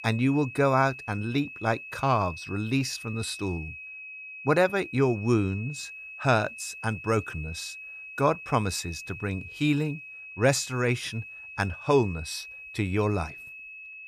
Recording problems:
high-pitched whine; noticeable; throughout; 2.5 kHz, 10 dB below the speech

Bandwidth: 14.5 kHz